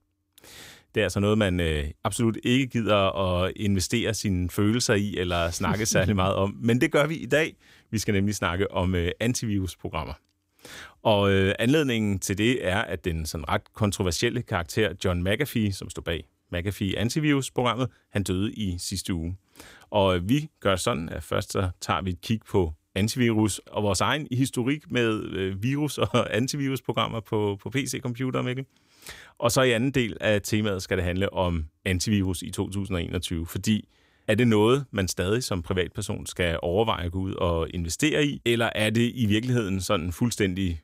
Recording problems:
none

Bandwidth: 15.5 kHz